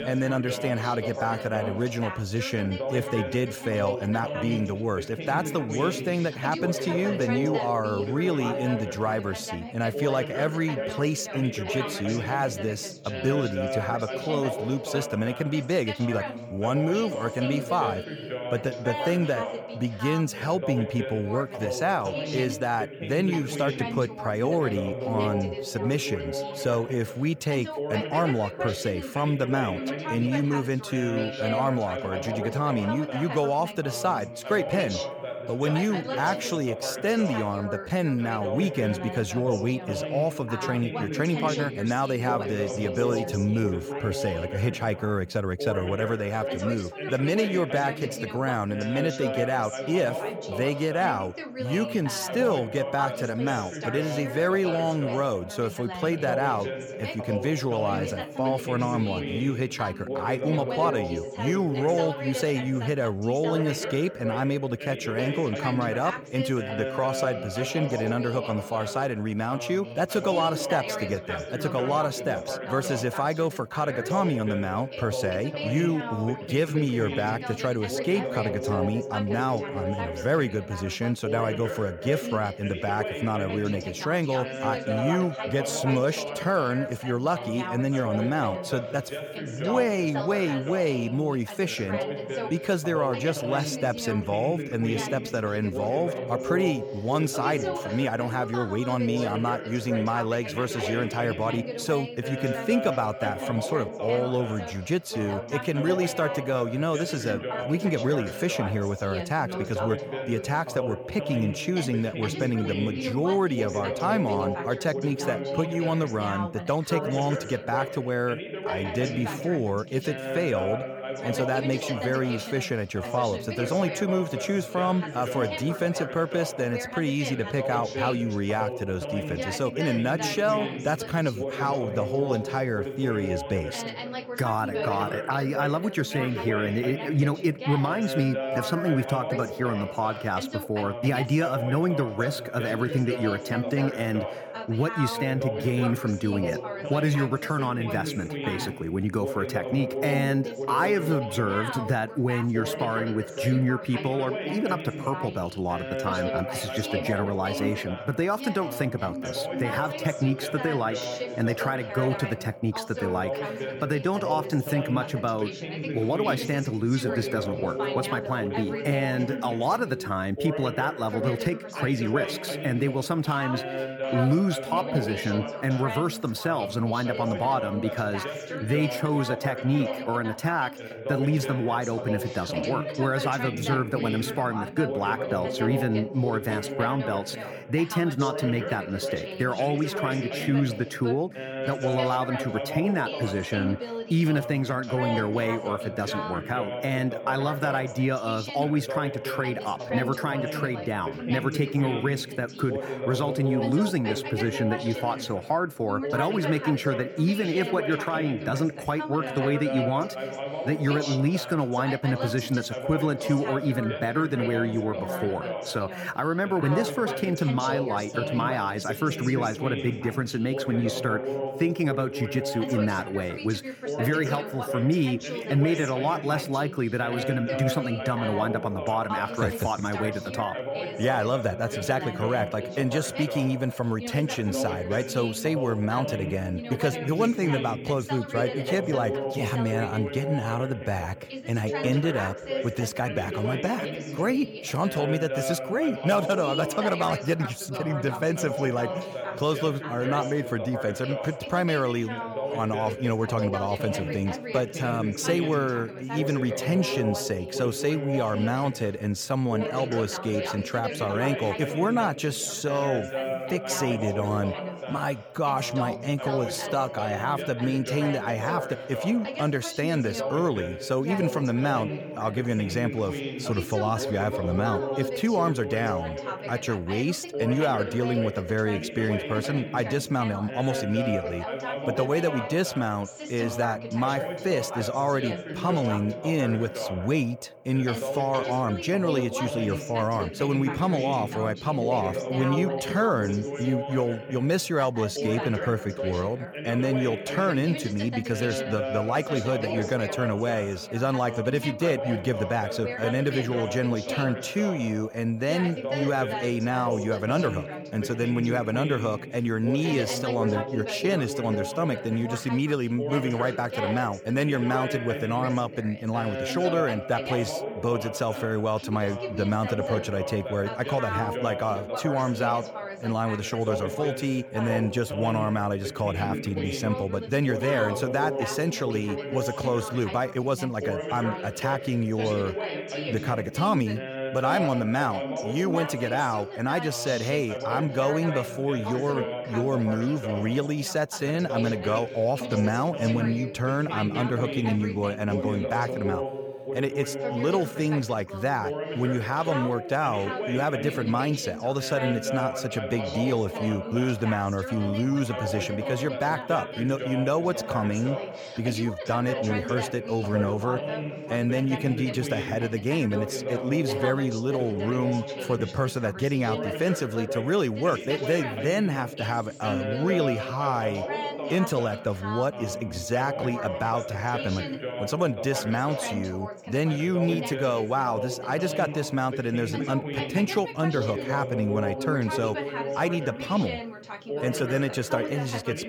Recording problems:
background chatter; loud; throughout; 2 voices, 5 dB below the speech

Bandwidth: 18.5 kHz